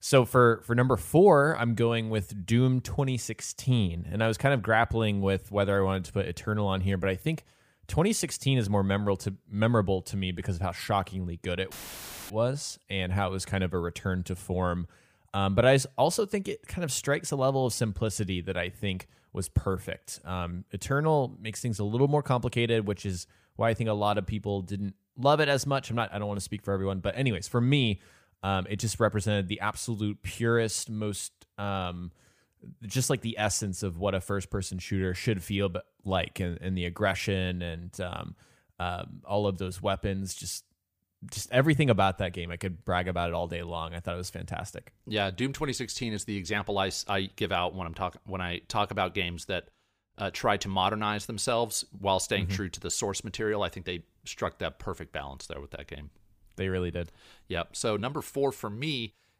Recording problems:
audio cutting out; filled with static; at 12 s for 0.5 s

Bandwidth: 15 kHz